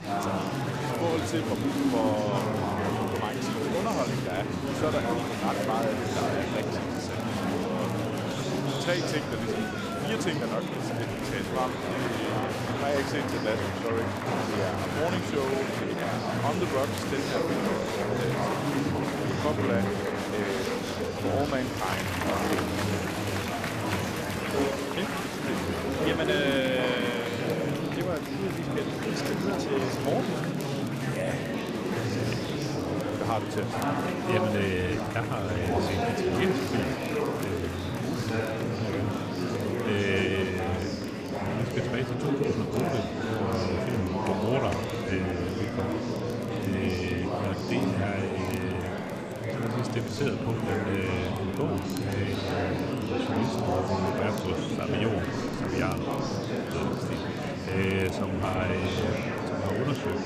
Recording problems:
murmuring crowd; very loud; throughout; 3 dB above the speech
crackle, like an old record; faint; 20 dB below the speech
high-pitched whine; very faint; throughout; 2.5 kHz, 35 dB below the speech

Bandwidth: 14.5 kHz